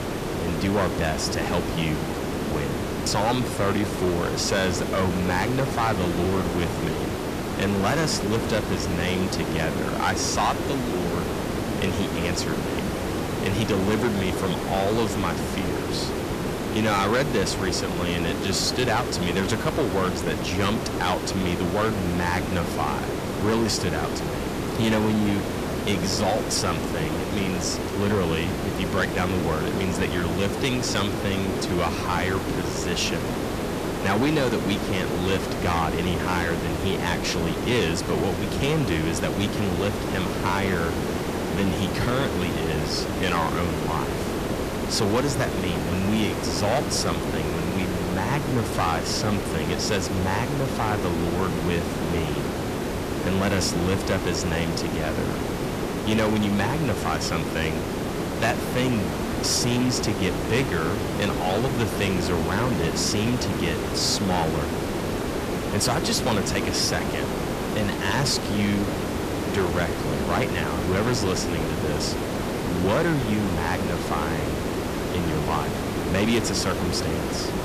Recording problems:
distortion; slight; 6% of the sound clipped
hiss; loud; throughout; 2 dB below the speech

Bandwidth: 14.5 kHz